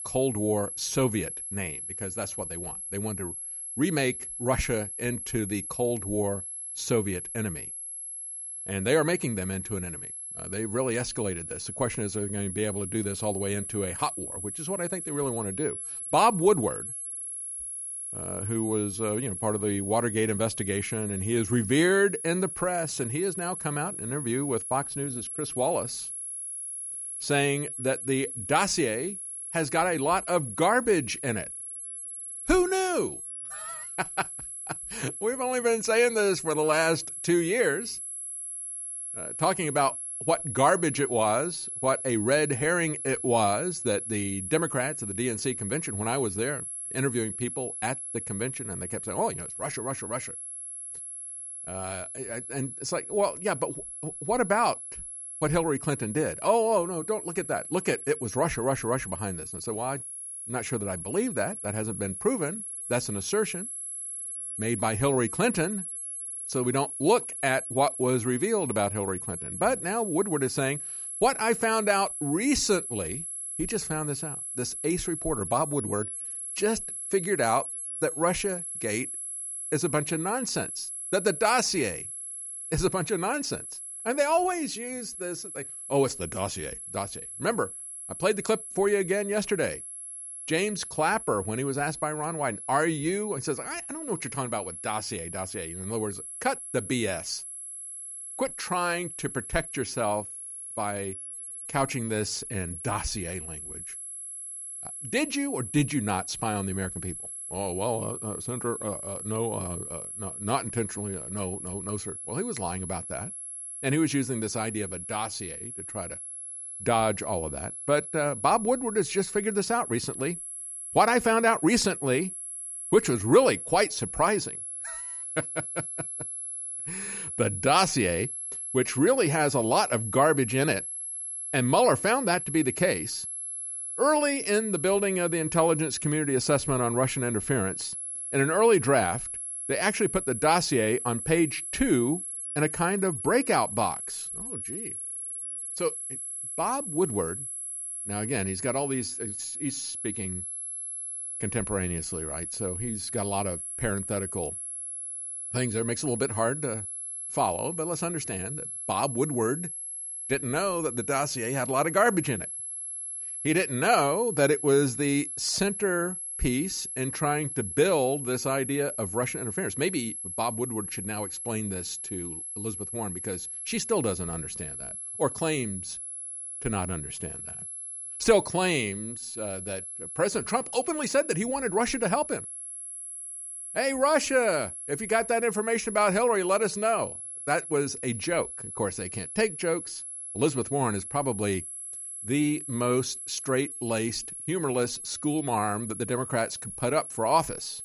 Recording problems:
high-pitched whine; loud; throughout; 11 kHz, 6 dB below the speech

